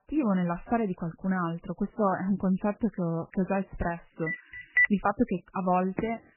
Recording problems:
garbled, watery; badly; nothing above 3 kHz
phone ringing; loud; at 4.5 s; peak 5 dB above the speech
footsteps; very faint; at 6 s; peak 9 dB below the speech

